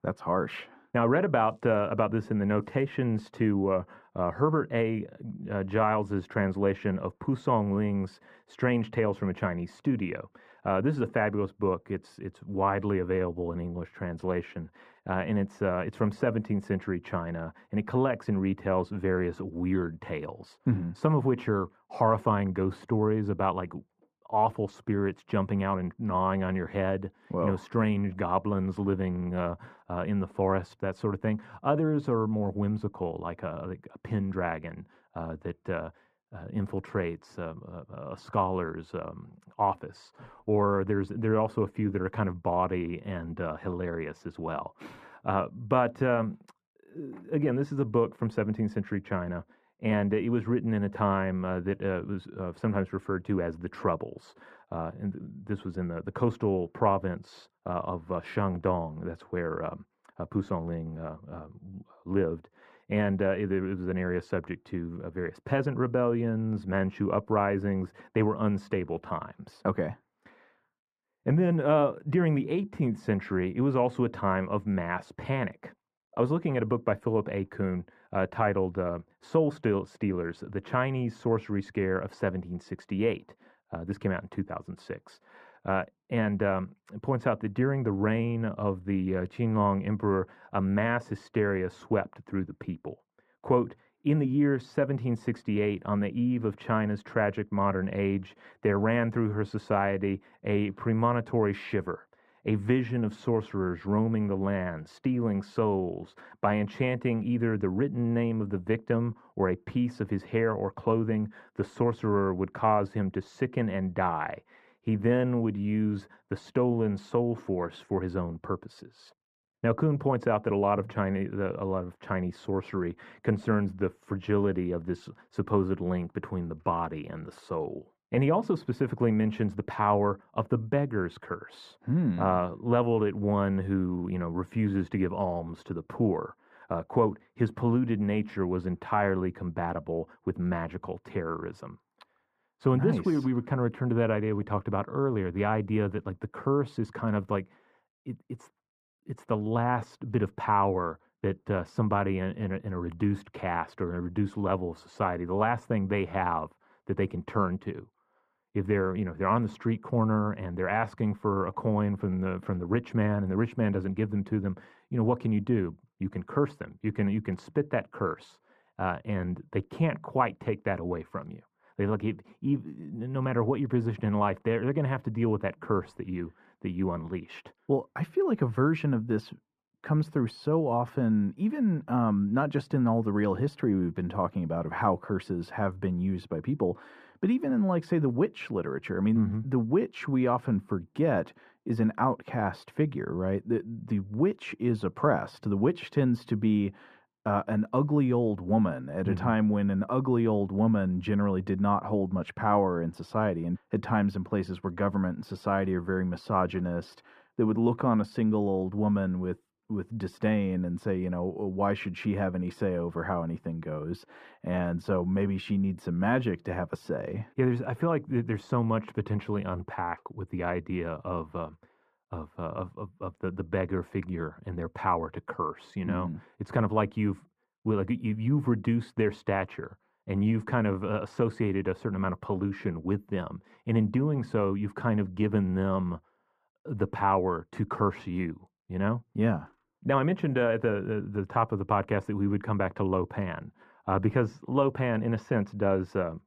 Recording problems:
muffled; very; fading above 3 kHz

